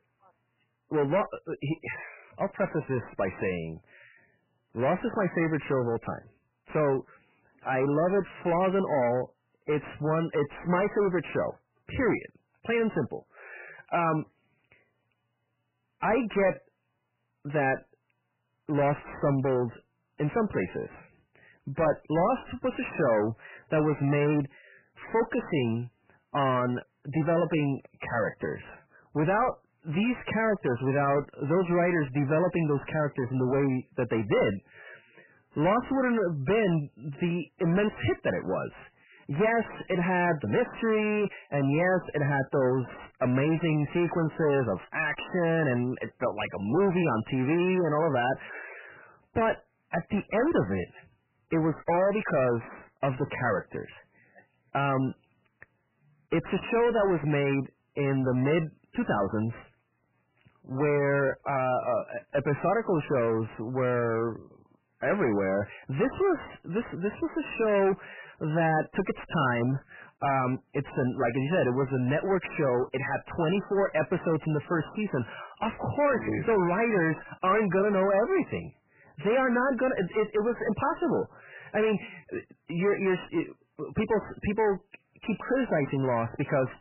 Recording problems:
distortion; heavy; 5 dB below the speech
garbled, watery; badly; nothing above 3 kHz

